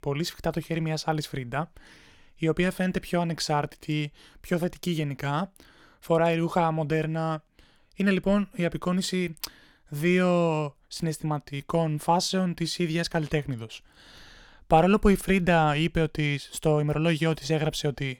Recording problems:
none

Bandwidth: 17.5 kHz